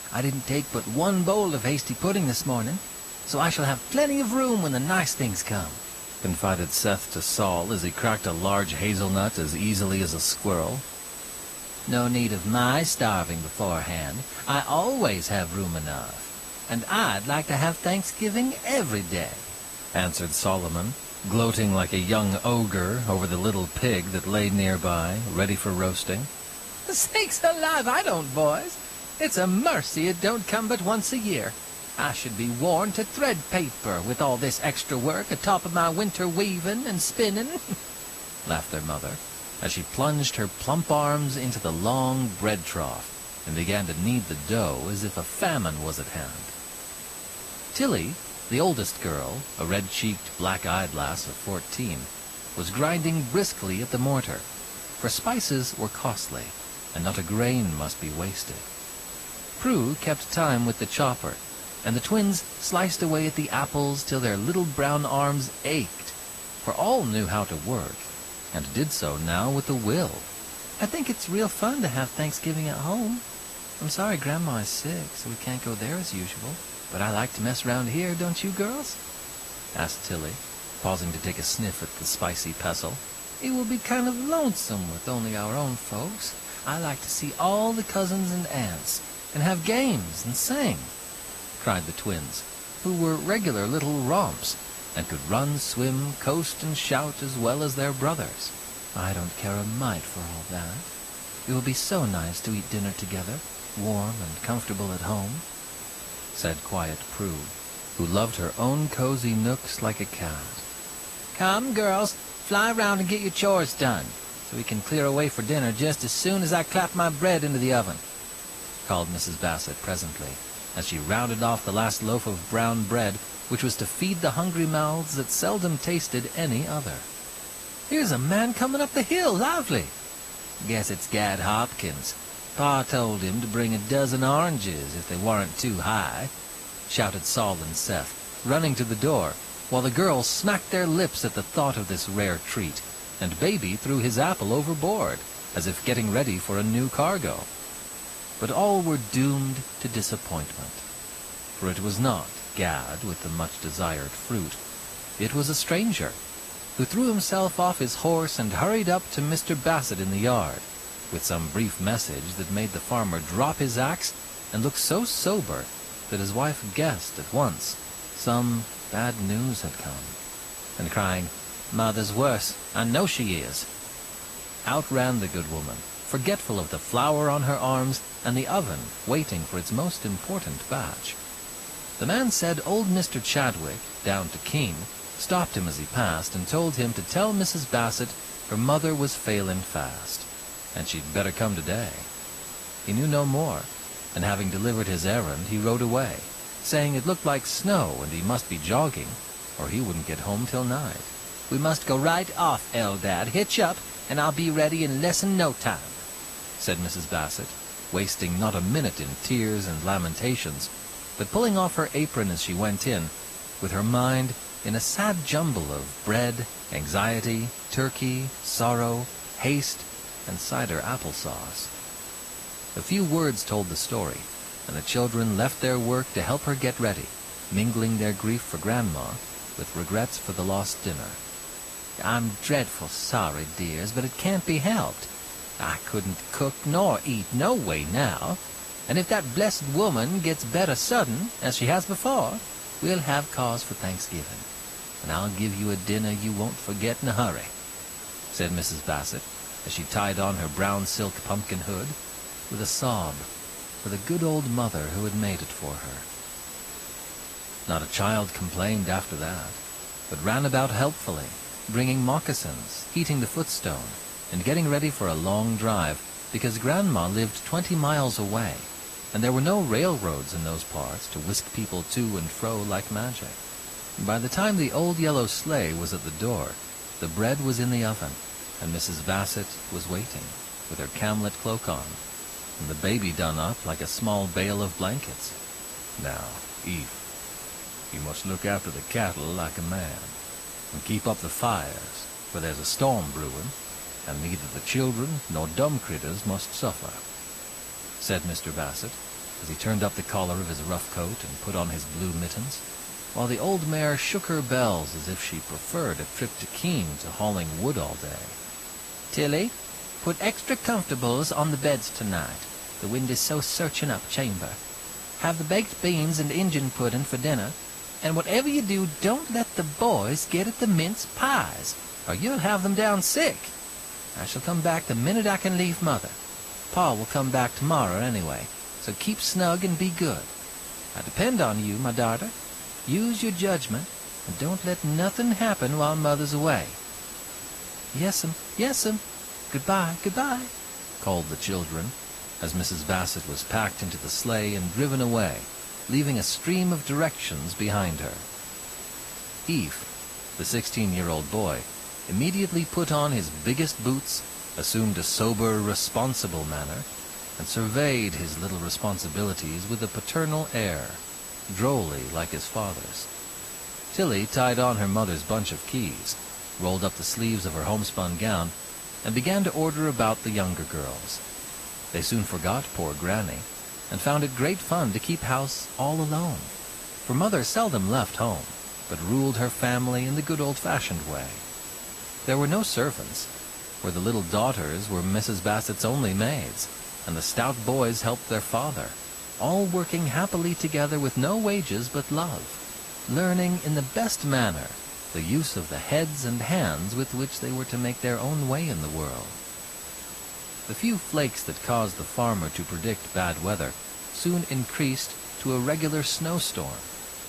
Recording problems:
garbled, watery; slightly; nothing above 14.5 kHz
high-pitched whine; noticeable; throughout; 8 kHz, 10 dB below the speech
hiss; noticeable; throughout; 10 dB below the speech

